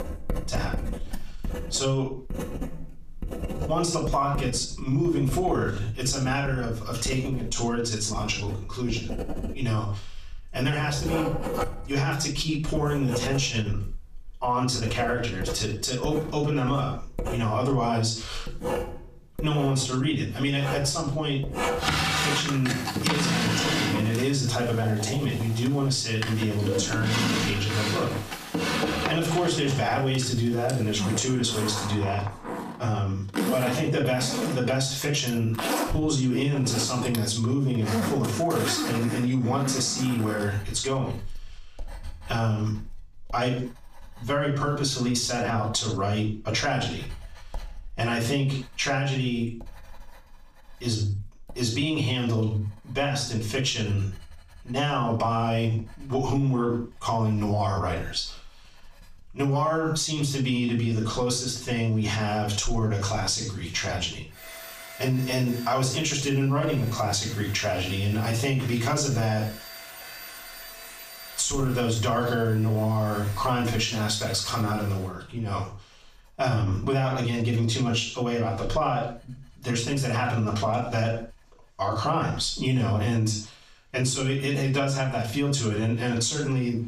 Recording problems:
off-mic speech; far
squashed, flat; heavily, background pumping
room echo; noticeable; dies away in 0.3 s
household noises; loud; throughout; 6 dB below the speech

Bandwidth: 14.5 kHz